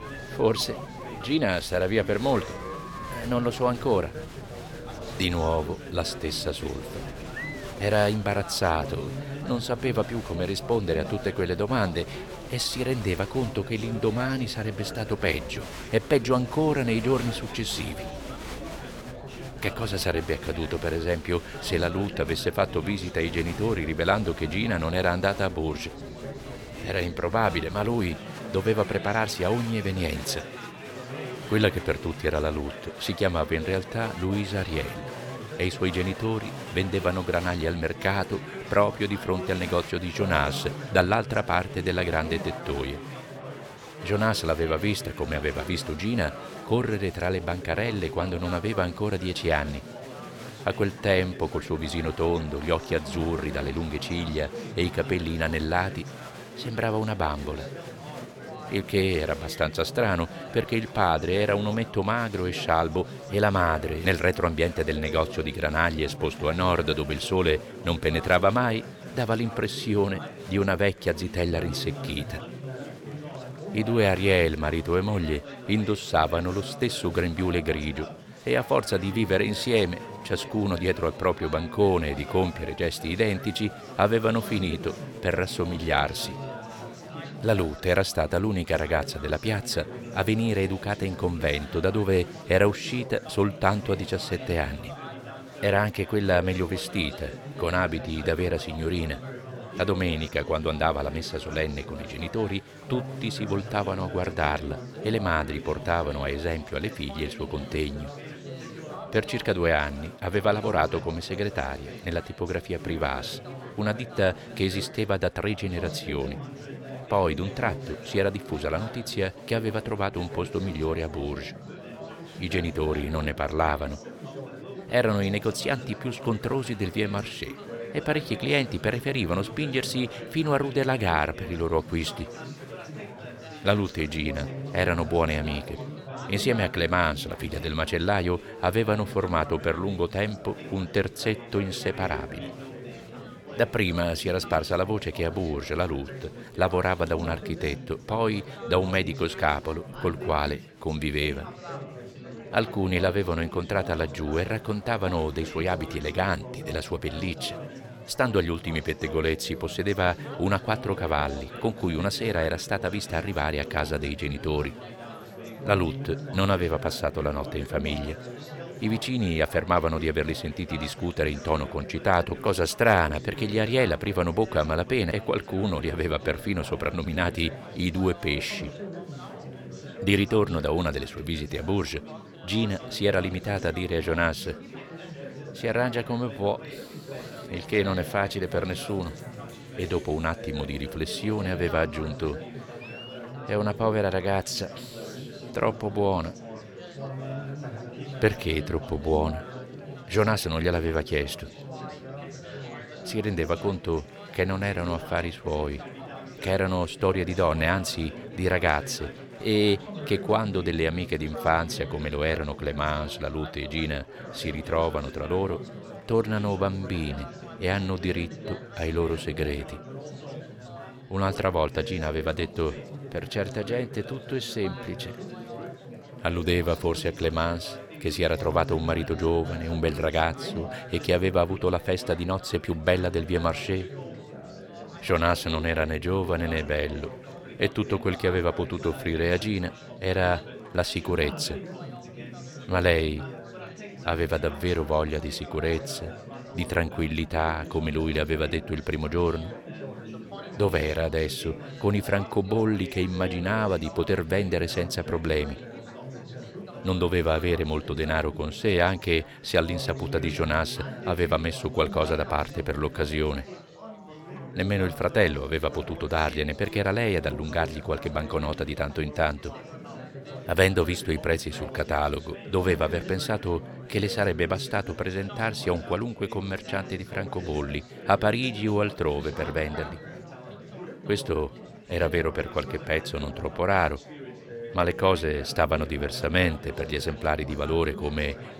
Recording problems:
chatter from many people; noticeable; throughout; 10 dB below the speech

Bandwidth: 17 kHz